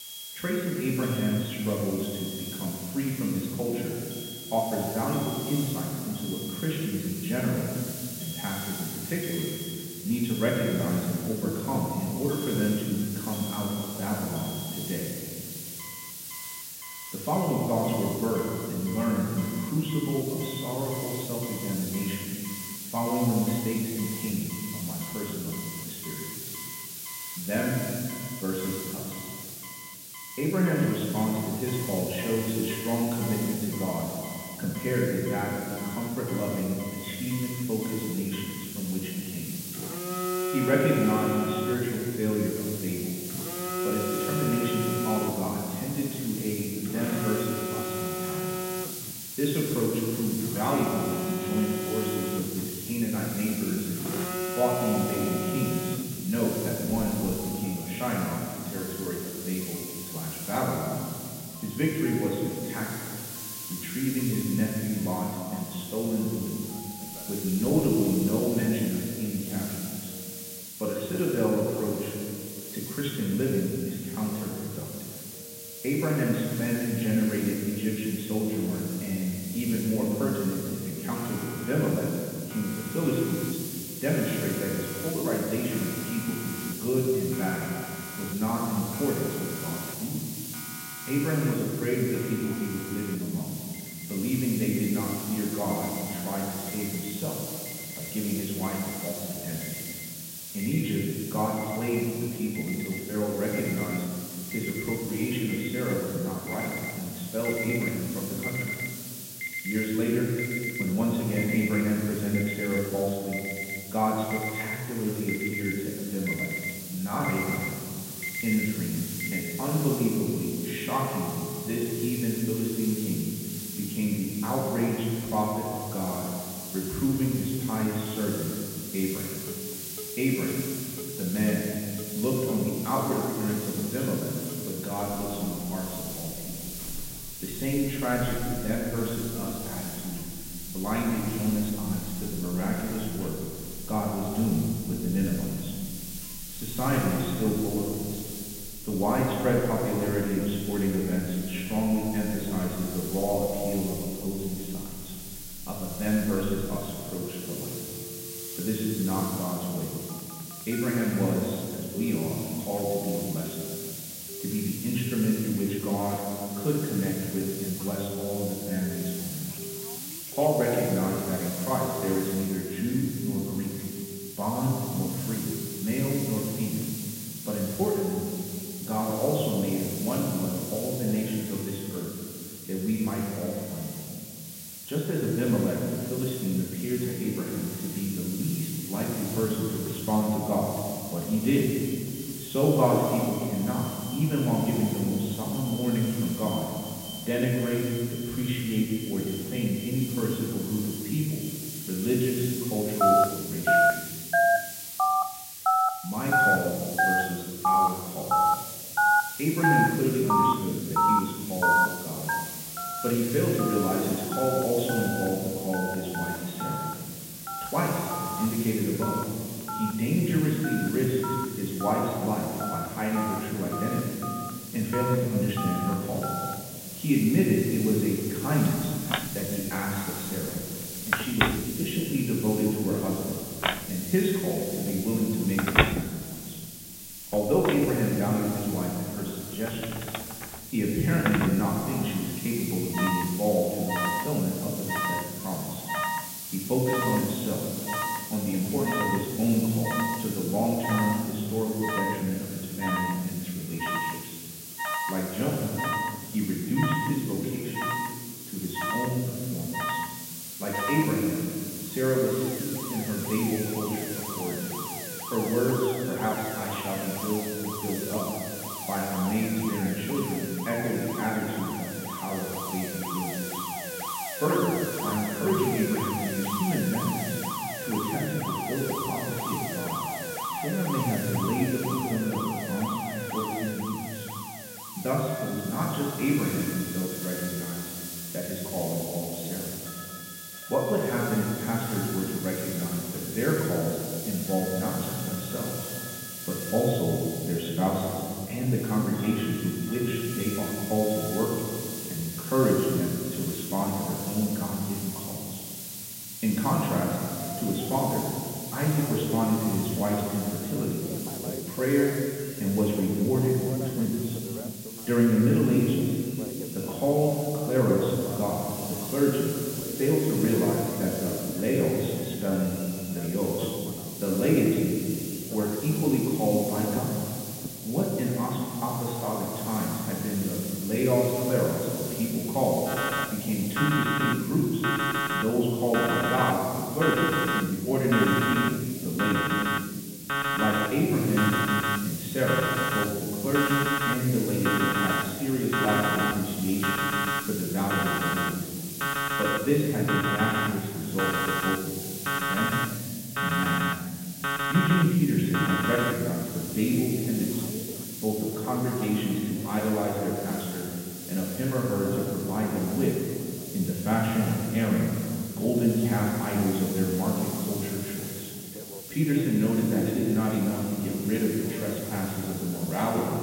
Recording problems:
off-mic speech; far
high frequencies cut off; severe; nothing above 4 kHz
room echo; noticeable; dies away in 1.9 s
alarms or sirens; loud; throughout; 4 dB below the speech
hiss; loud; throughout; 8 dB below the speech

